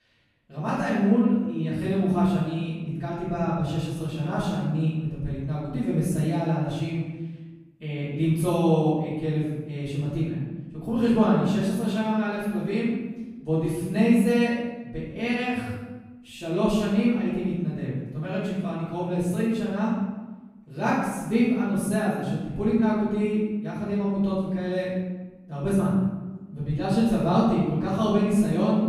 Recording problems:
room echo; strong; dies away in 1 s
off-mic speech; far

